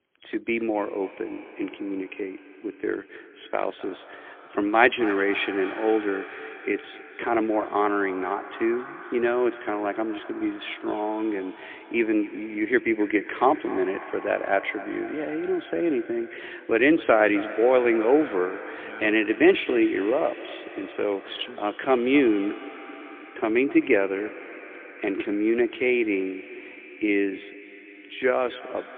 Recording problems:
phone-call audio; poor line; nothing above 3.5 kHz
echo of what is said; noticeable; throughout; 260 ms later, 15 dB below the speech

